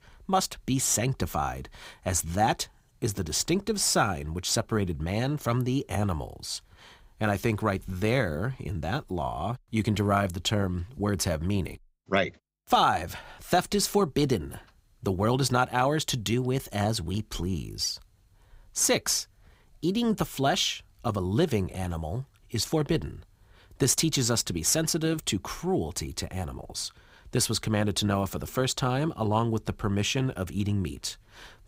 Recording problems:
none

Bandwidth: 15.5 kHz